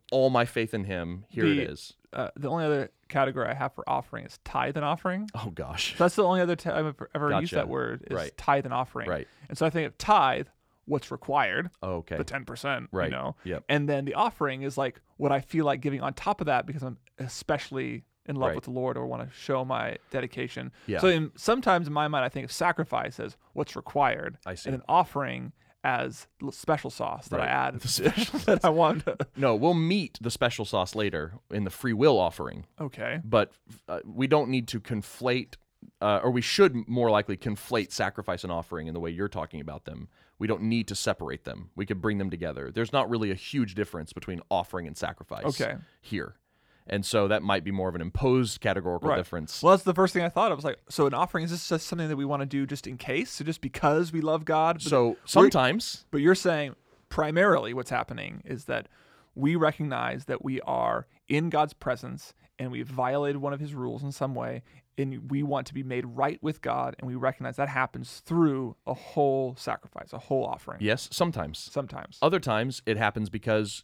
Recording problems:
none

